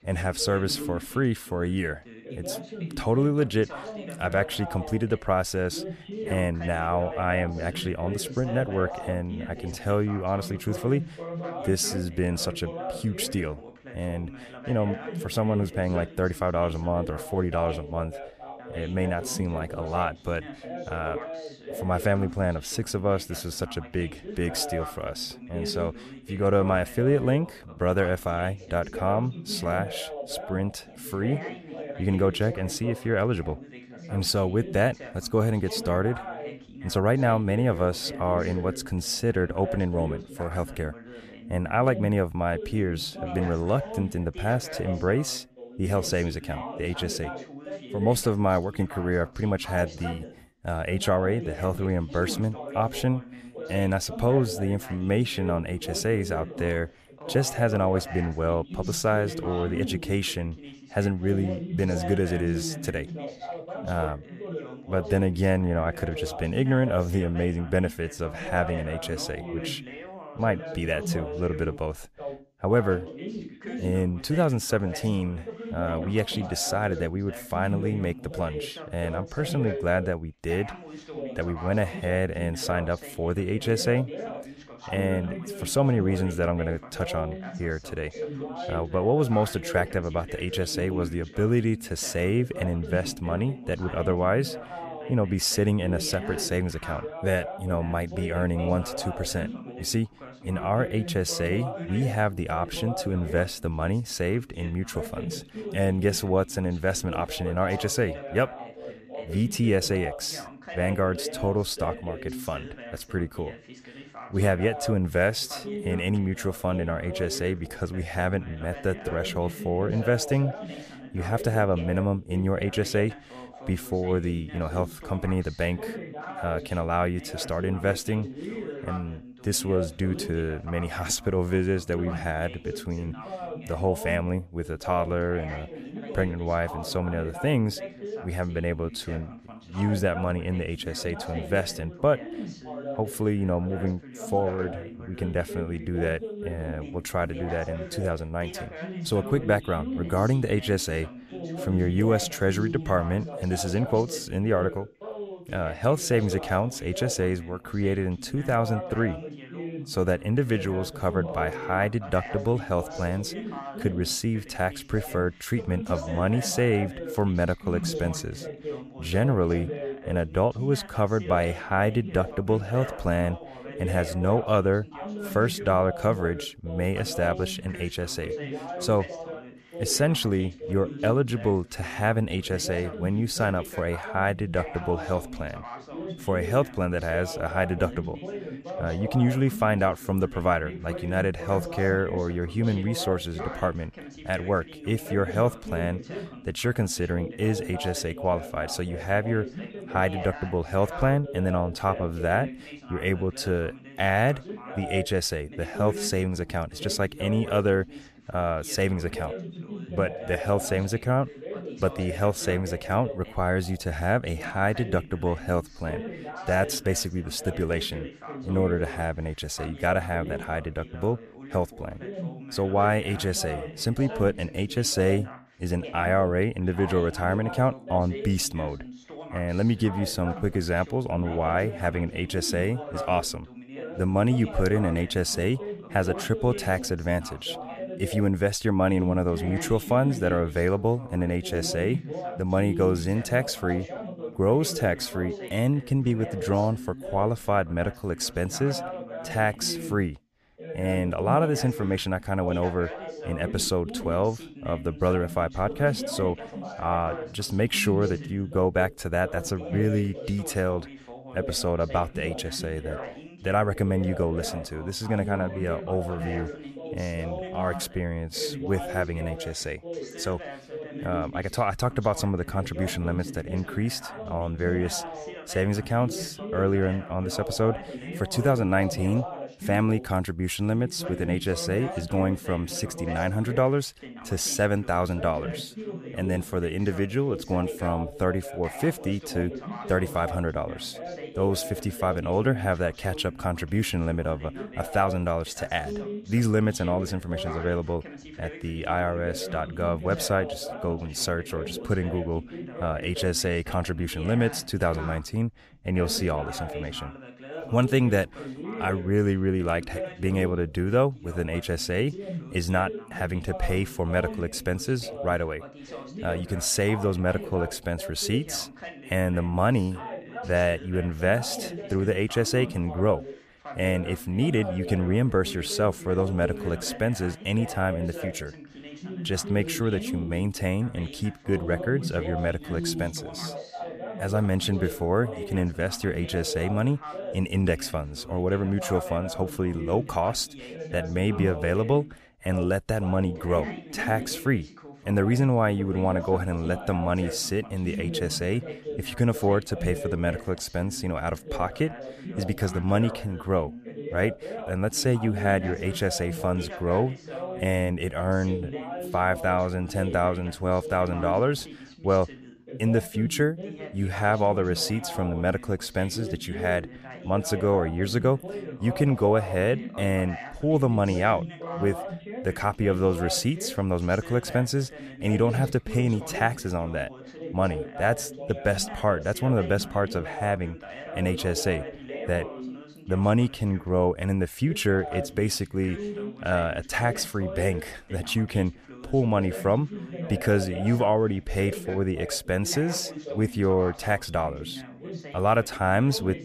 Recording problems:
background chatter; noticeable; throughout; 2 voices, 10 dB below the speech

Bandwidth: 14.5 kHz